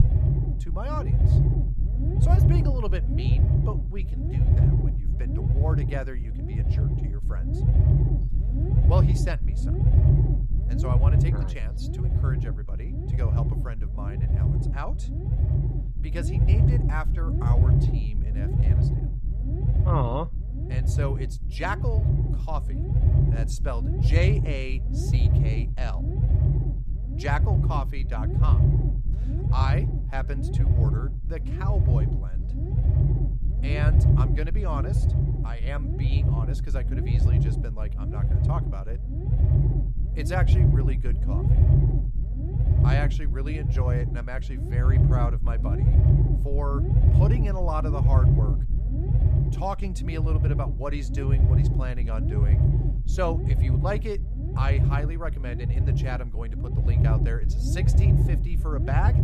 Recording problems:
low rumble; loud; throughout; 2 dB below the speech

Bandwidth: 14.5 kHz